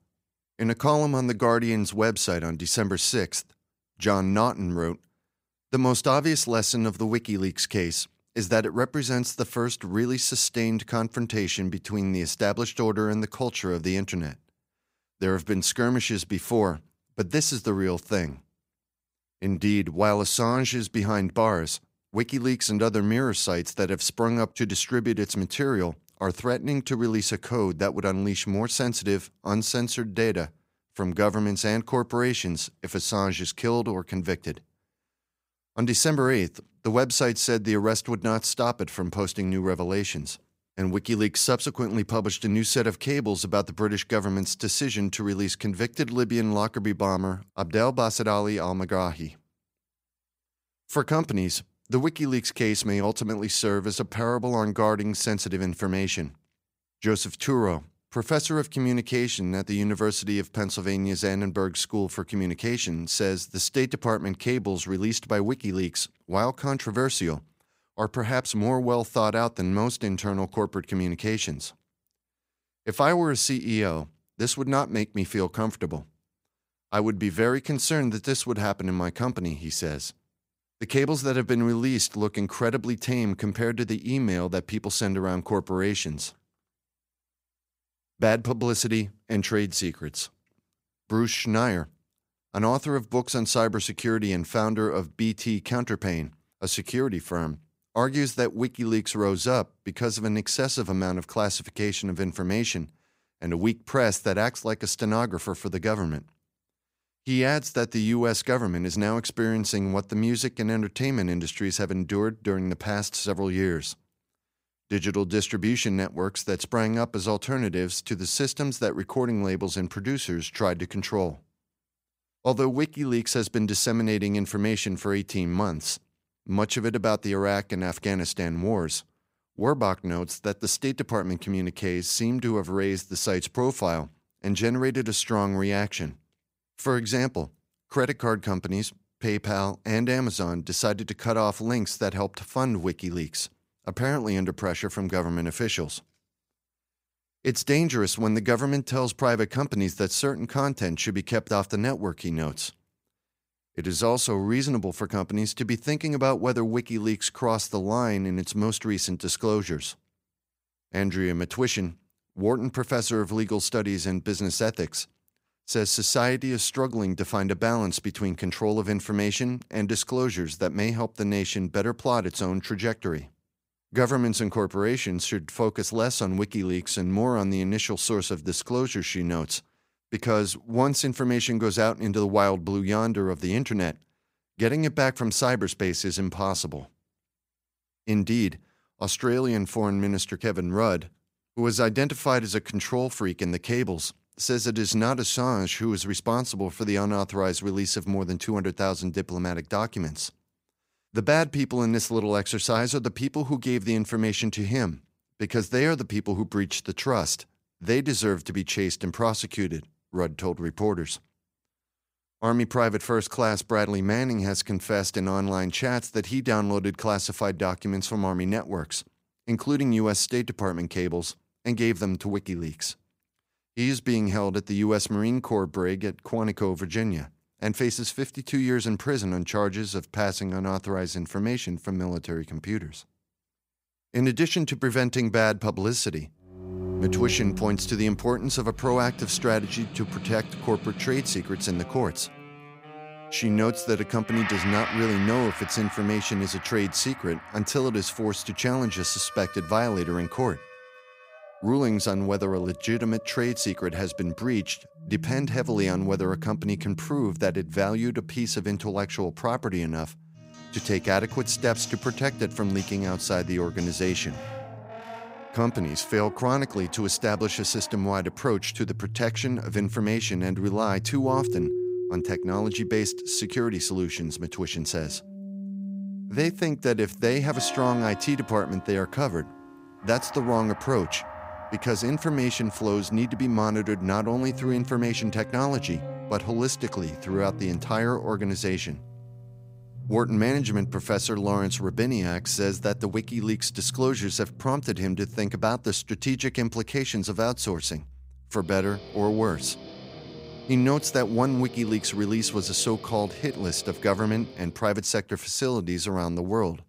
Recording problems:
background music; noticeable; from 3:57 on; 10 dB below the speech

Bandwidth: 15.5 kHz